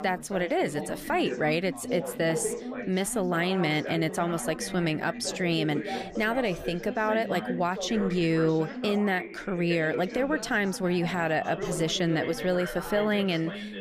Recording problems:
background chatter; loud; throughout; 4 voices, 8 dB below the speech

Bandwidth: 15 kHz